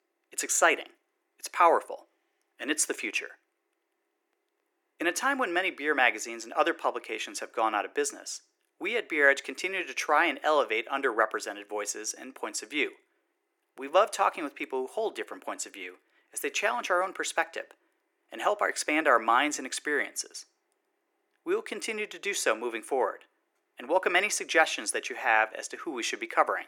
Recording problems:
thin; very; fading below 350 Hz

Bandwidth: 17.5 kHz